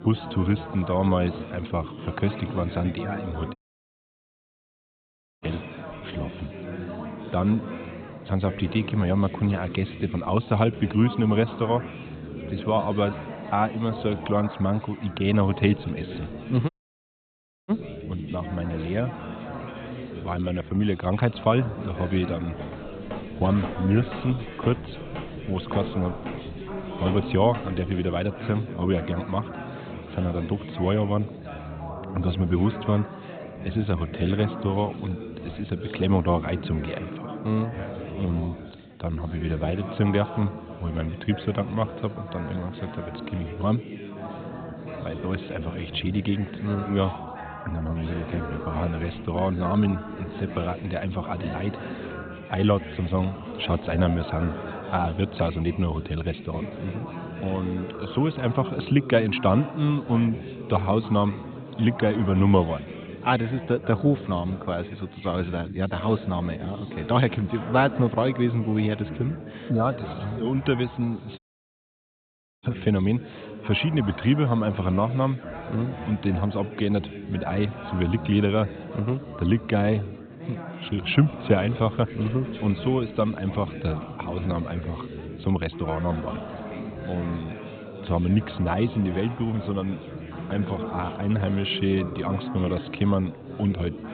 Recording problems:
high frequencies cut off; severe; nothing above 4 kHz
chatter from many people; loud; throughout; 10 dB below the speech
audio cutting out; at 3.5 s for 2 s, at 17 s for 1 s and at 1:11 for 1 s
footsteps; faint; from 23 to 28 s; peak 10 dB below the speech

